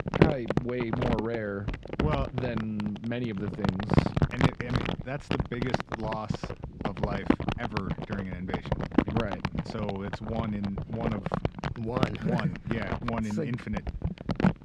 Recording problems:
muffled; slightly; fading above 3.5 kHz
household noises; very loud; throughout; 3 dB above the speech

